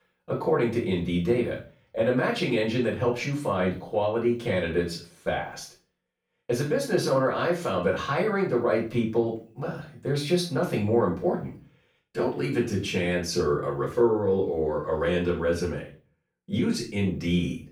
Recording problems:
off-mic speech; far
room echo; slight; dies away in 0.3 s

